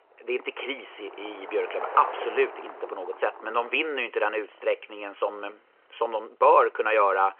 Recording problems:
phone-call audio
traffic noise; noticeable; throughout; 15 dB below the speech

